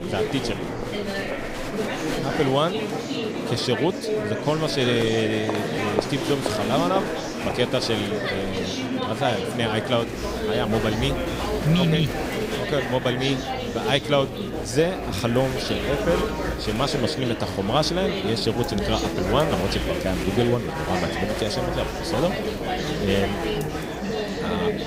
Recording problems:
chatter from many people; loud; throughout; 2 dB below the speech

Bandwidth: 15.5 kHz